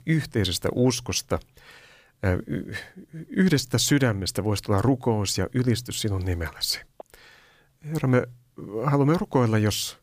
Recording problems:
none

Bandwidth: 15 kHz